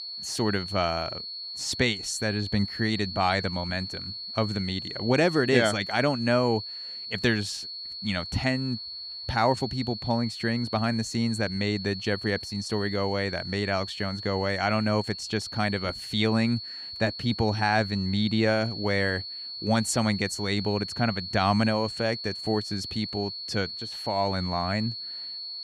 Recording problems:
high-pitched whine; loud; throughout; 4.5 kHz, 7 dB below the speech

